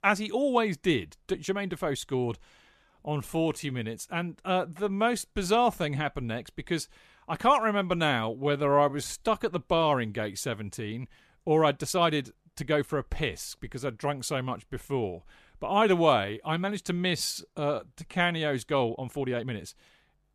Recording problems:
uneven, jittery; strongly; from 1 to 20 s

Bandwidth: 14 kHz